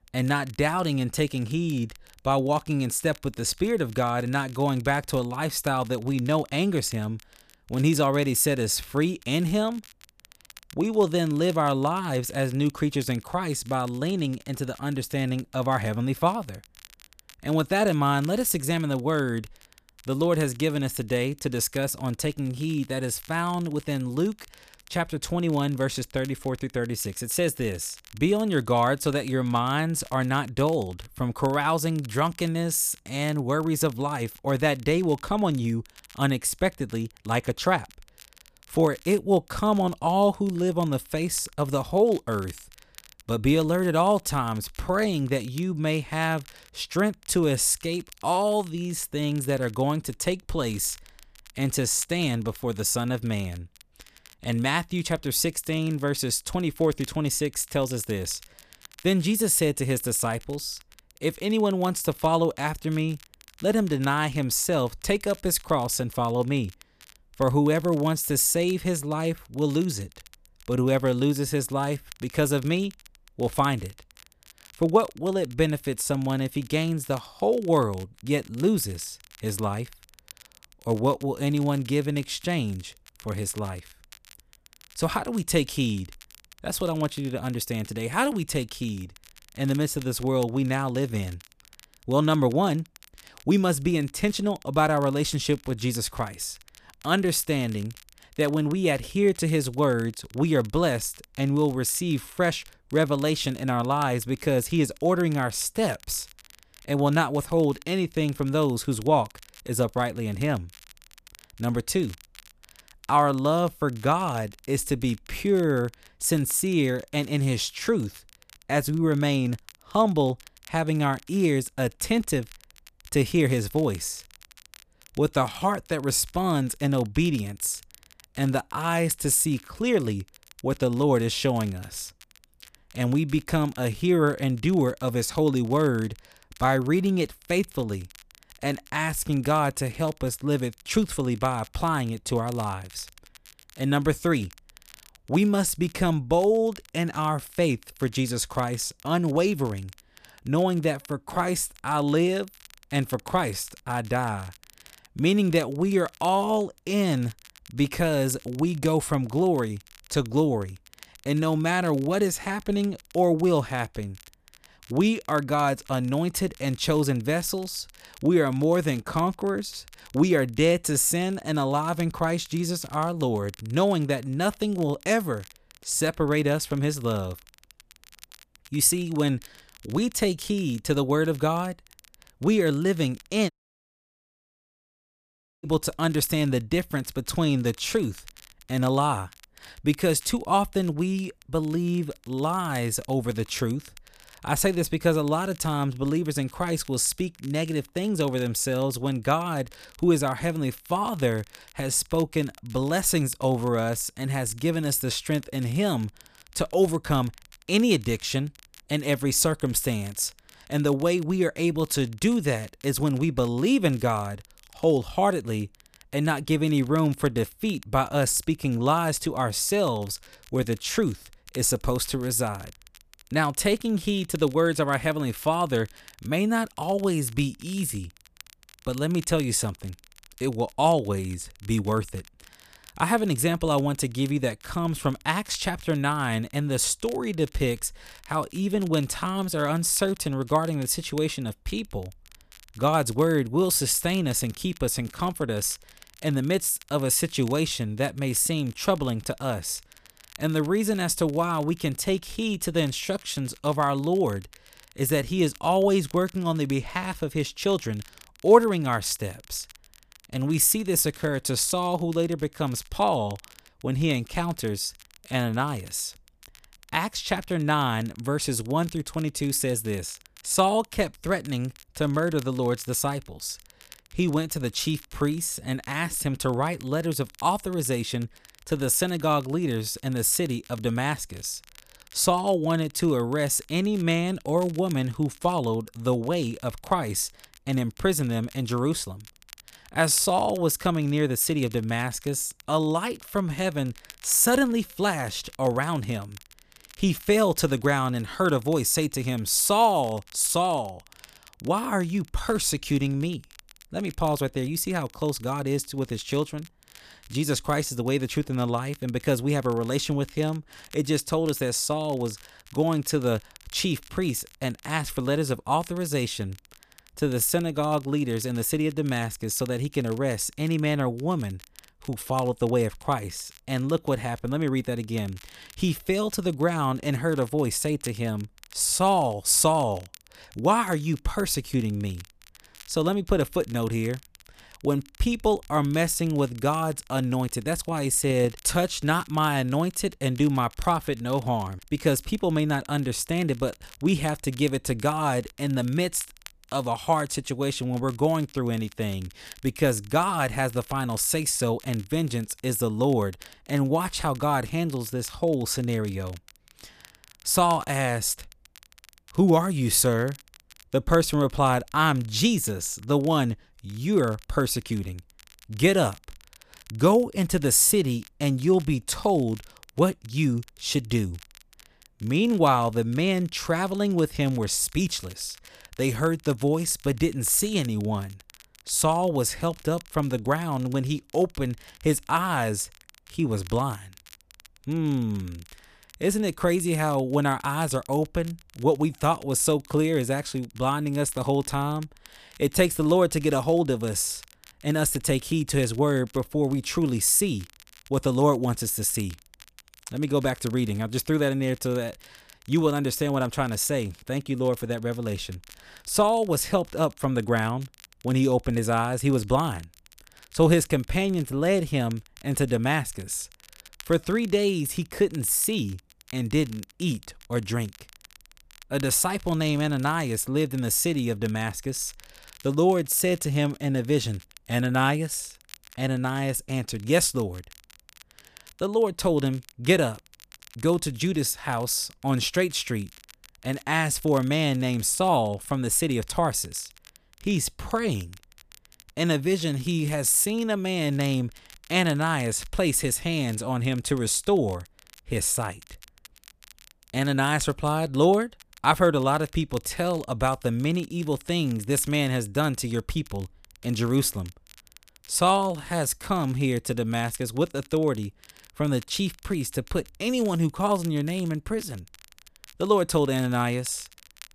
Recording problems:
crackle, like an old record; faint; 25 dB below the speech
audio cutting out; at 3:04 for 2 s

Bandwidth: 14.5 kHz